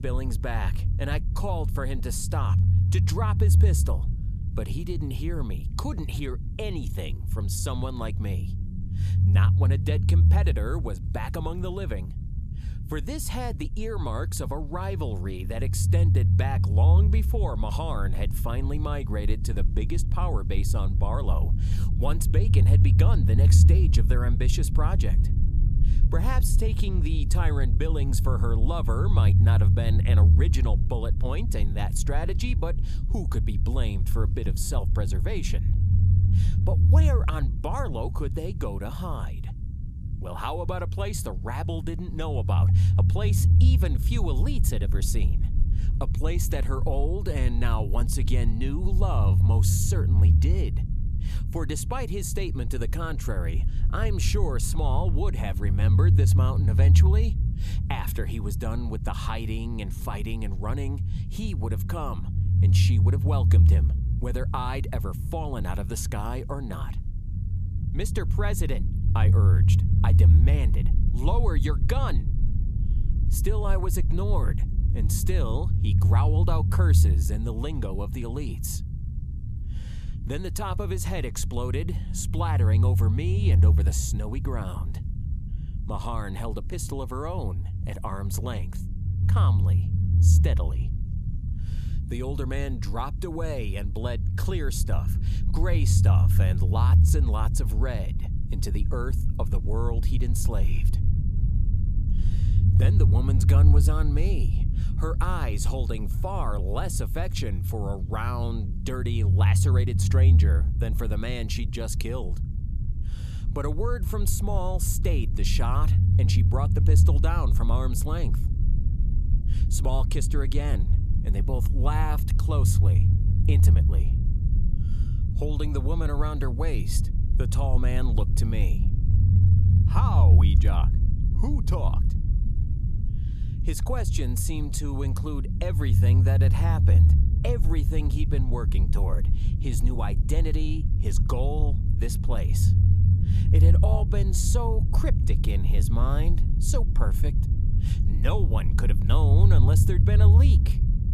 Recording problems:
low rumble; loud; throughout; 5 dB below the speech

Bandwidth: 14.5 kHz